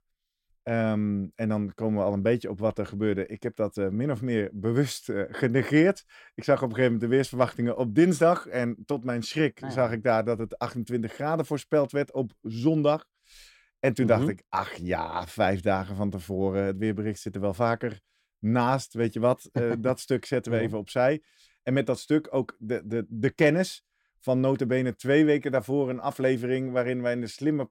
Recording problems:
none

